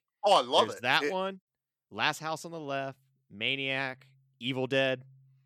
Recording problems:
none

